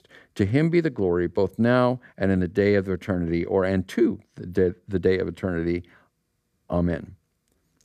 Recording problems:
none

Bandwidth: 14.5 kHz